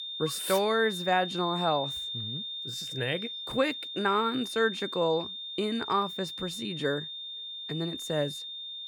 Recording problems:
high-pitched whine; loud; throughout; 3.5 kHz, 5 dB below the speech

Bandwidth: 18.5 kHz